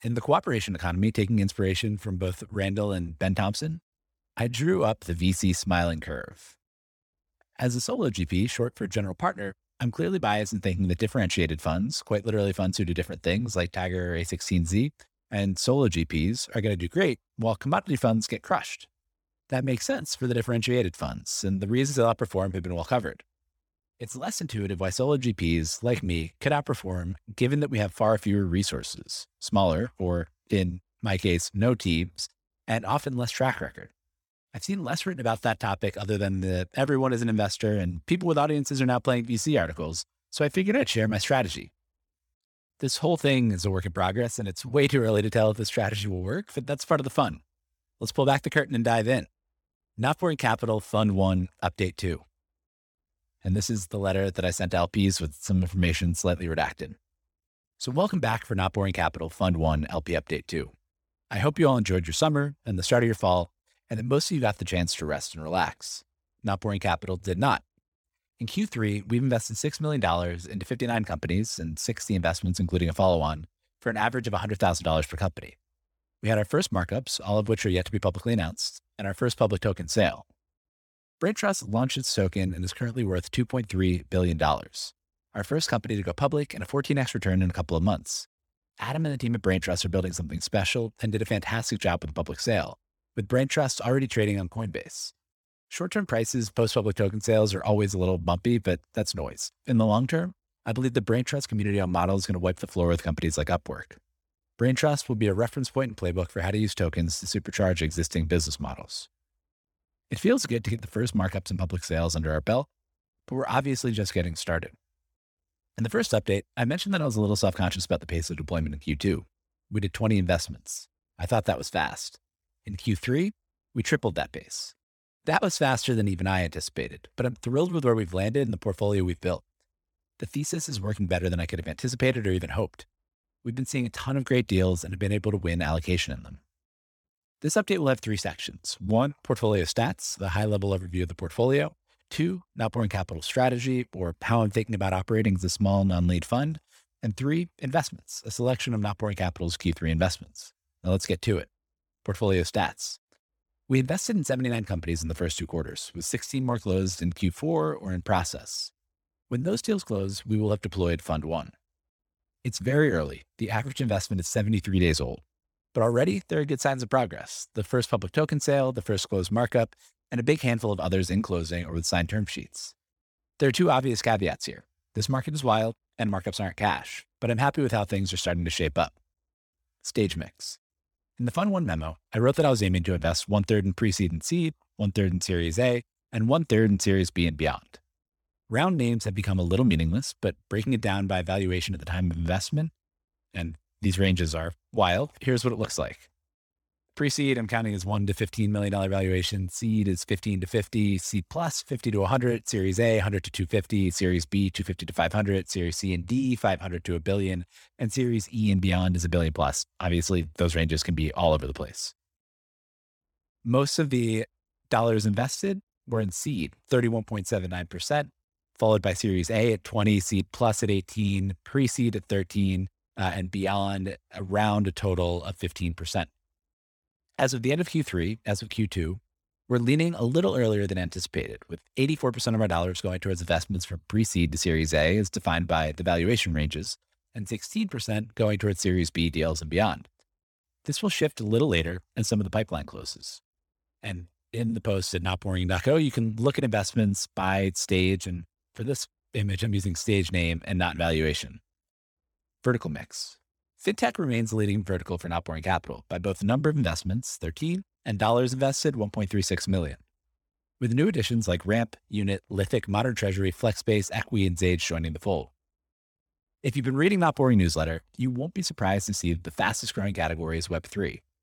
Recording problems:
none

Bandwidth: 18.5 kHz